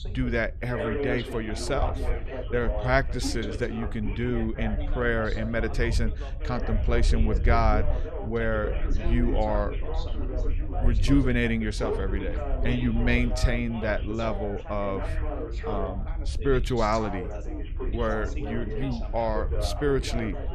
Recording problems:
background chatter; loud; throughout; 3 voices, 8 dB below the speech
wind noise on the microphone; occasional gusts; 20 dB below the speech

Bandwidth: 13.5 kHz